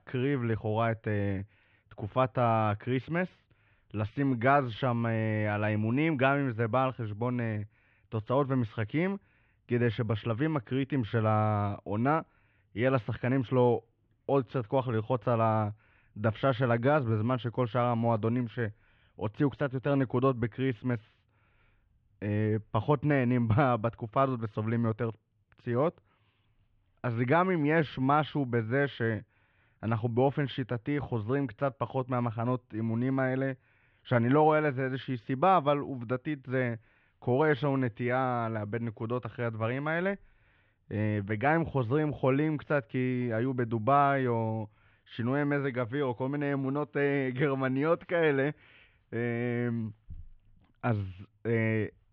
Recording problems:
muffled; very; fading above 3 kHz

